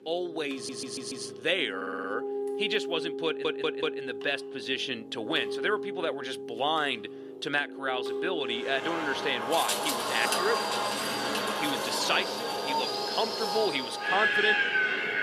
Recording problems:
thin; somewhat; fading below 400 Hz
wind in the background; very loud; from 8.5 s on; 2 dB above the speech
background music; loud; throughout; 7 dB below the speech
household noises; faint; throughout; 25 dB below the speech
audio stuttering; at 0.5 s, at 2 s and at 3.5 s

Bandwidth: 14 kHz